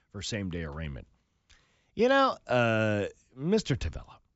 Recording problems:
high frequencies cut off; noticeable; nothing above 8 kHz

